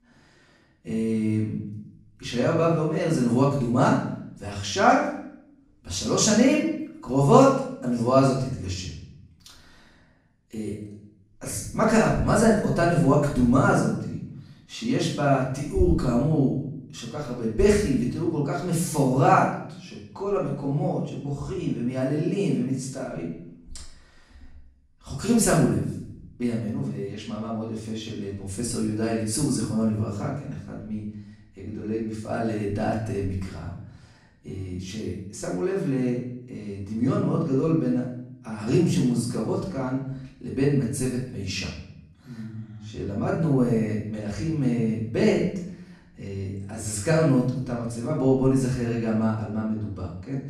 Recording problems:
off-mic speech; far
room echo; noticeable; dies away in 0.6 s

